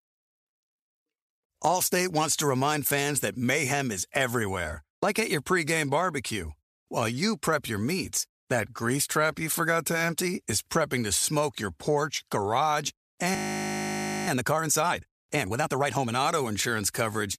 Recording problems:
audio freezing; at 13 s for 1 s

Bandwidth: 14.5 kHz